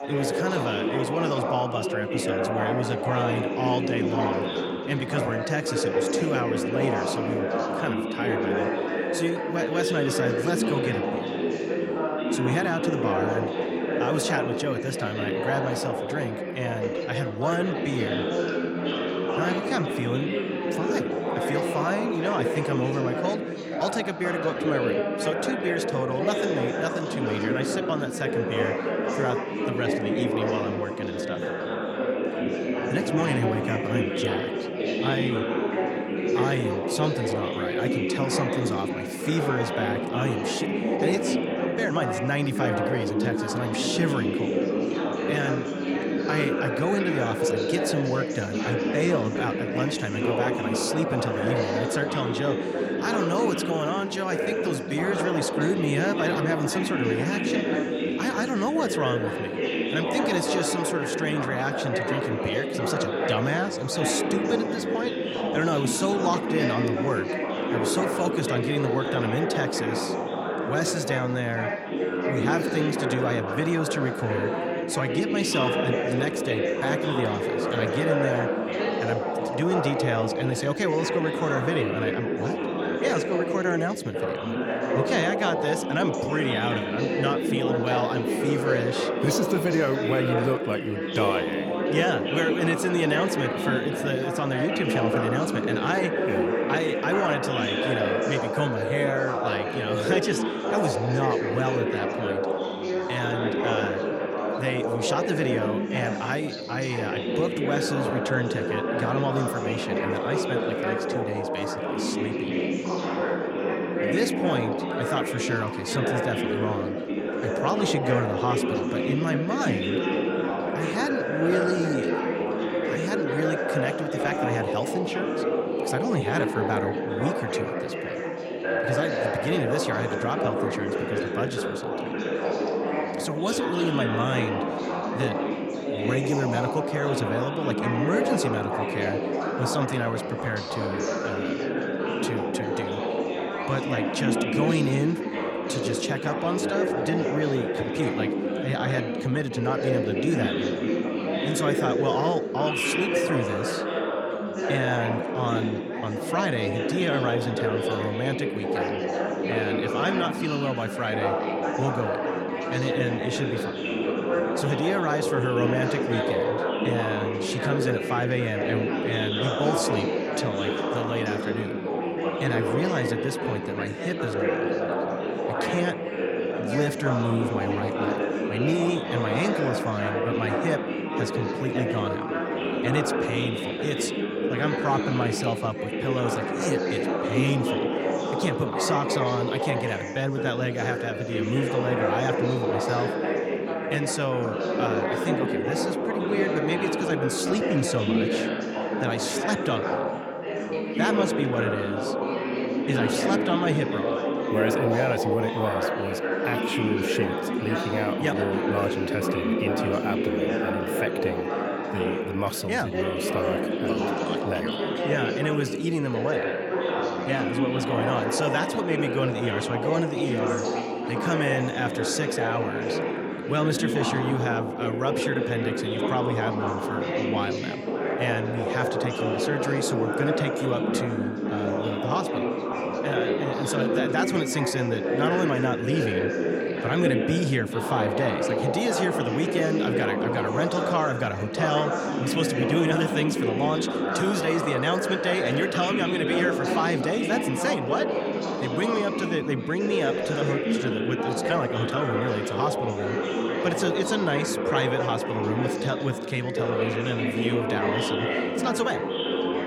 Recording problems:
chatter from many people; very loud; throughout; 2 dB above the speech

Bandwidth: 18.5 kHz